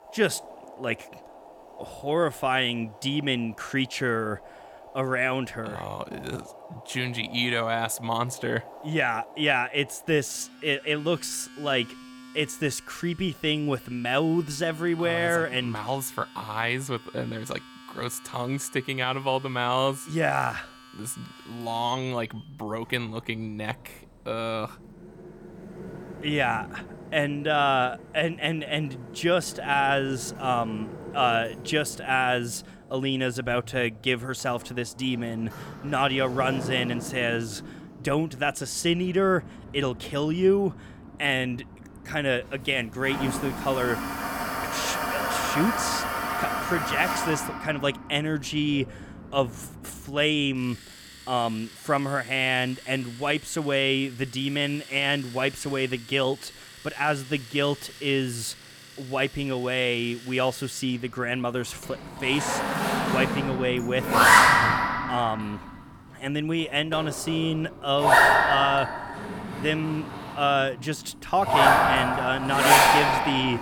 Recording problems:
household noises; very loud; throughout; 3 dB above the speech

